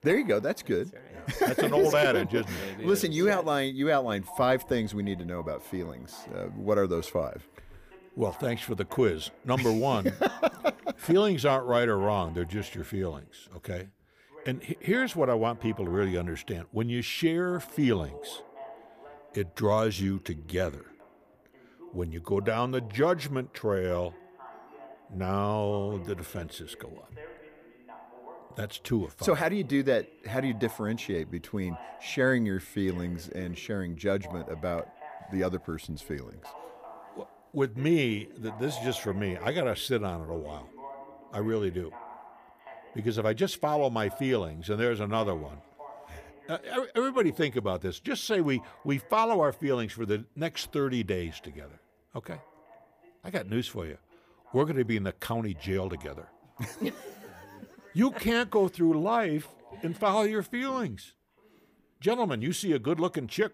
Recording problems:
voice in the background; faint; throughout; 20 dB below the speech

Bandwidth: 15 kHz